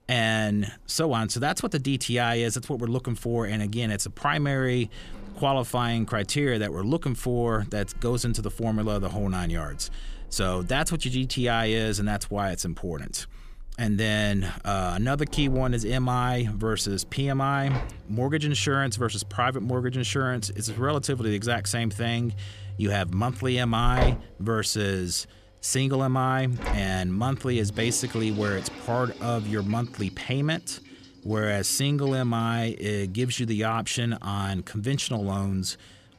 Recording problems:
household noises; noticeable; throughout; 15 dB below the speech

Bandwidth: 14.5 kHz